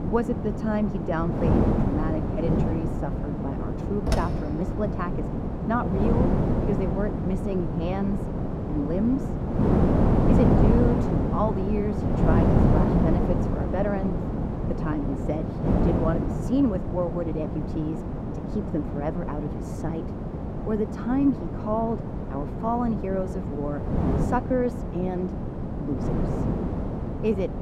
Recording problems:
muffled; slightly; fading above 1.5 kHz
wind noise on the microphone; heavy; 1 dB below the speech
door banging; loud; at 4 s; peak level with the speech

